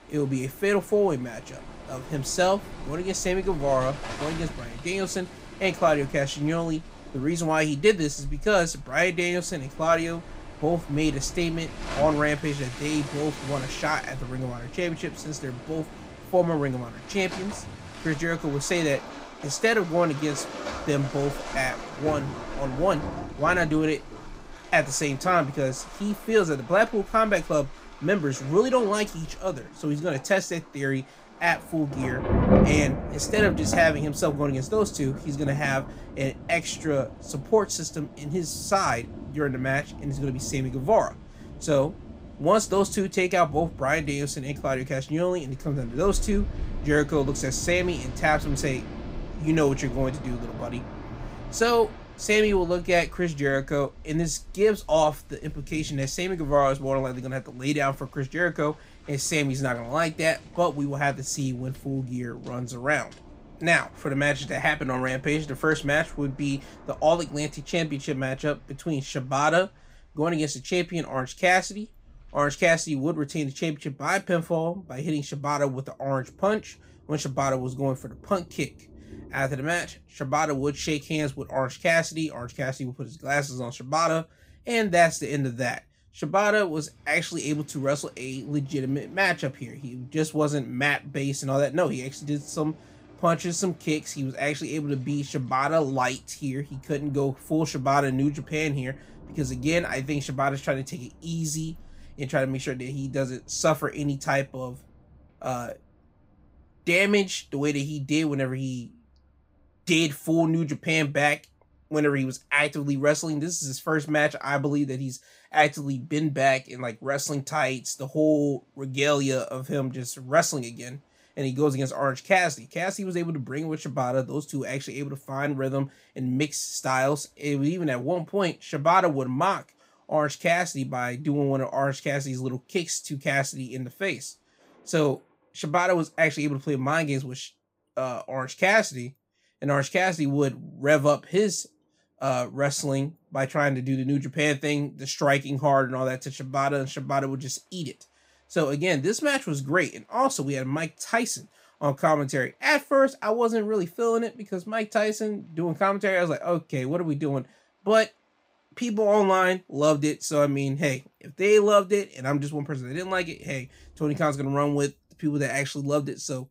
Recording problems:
rain or running water; noticeable; throughout; 10 dB below the speech

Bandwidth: 15.5 kHz